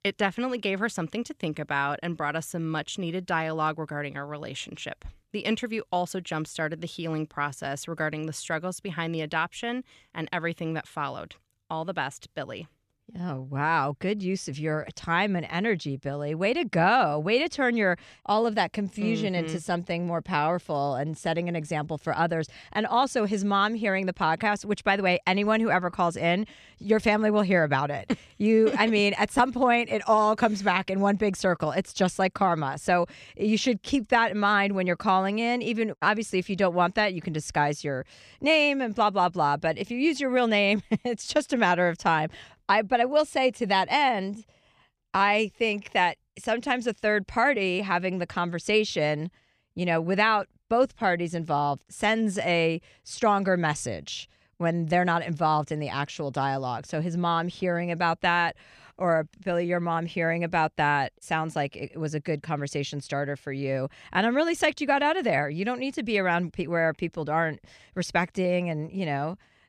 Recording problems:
none

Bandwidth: 14.5 kHz